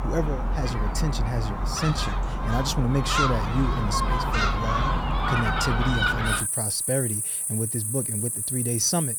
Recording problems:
animal sounds; very loud; throughout; 3 dB above the speech

